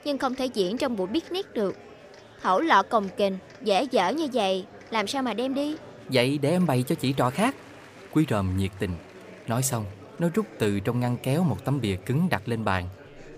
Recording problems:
murmuring crowd; noticeable; throughout; 20 dB below the speech

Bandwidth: 15 kHz